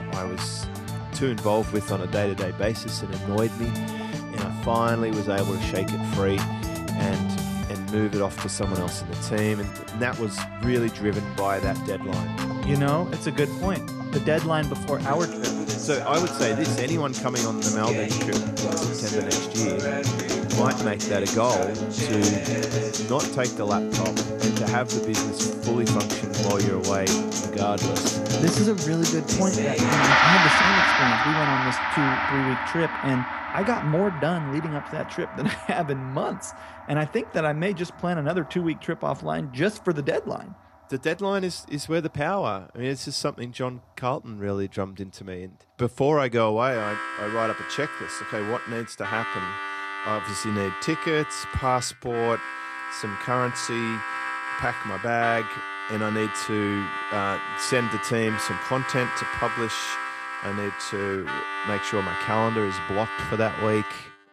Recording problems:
background music; very loud; throughout; as loud as the speech

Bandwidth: 14 kHz